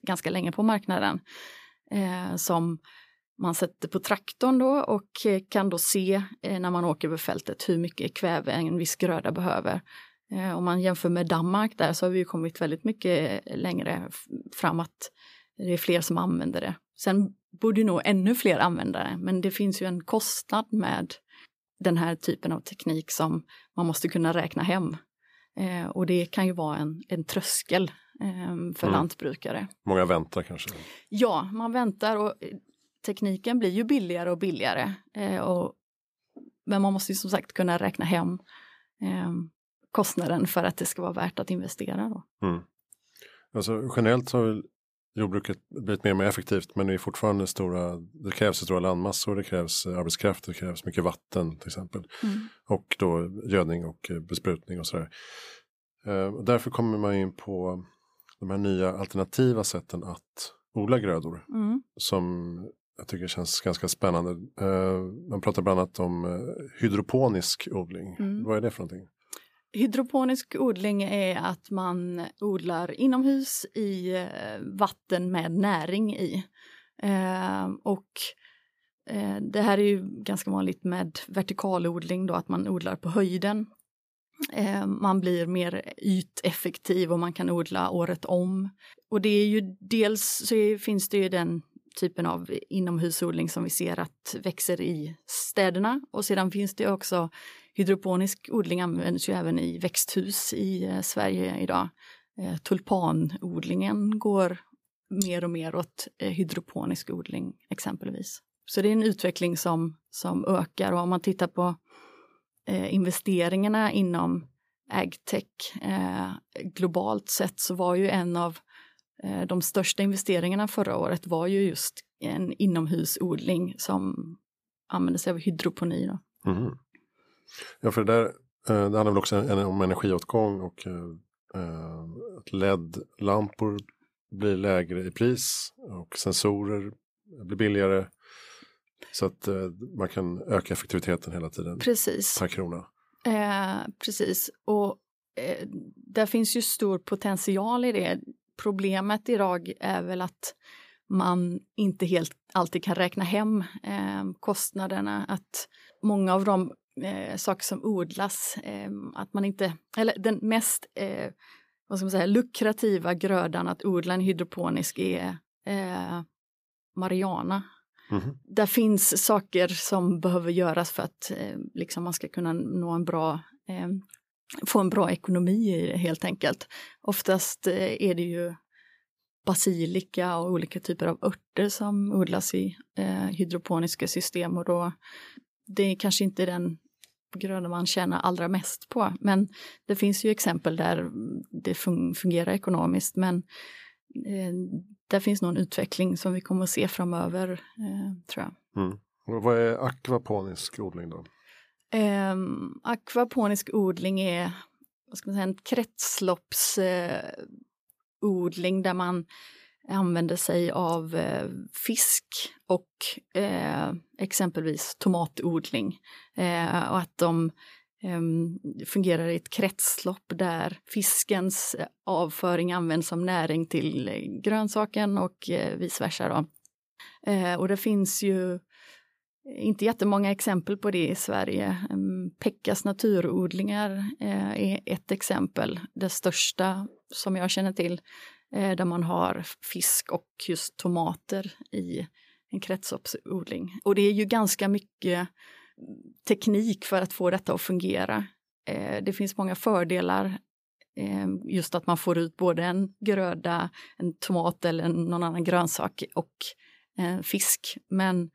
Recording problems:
none

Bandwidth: 15 kHz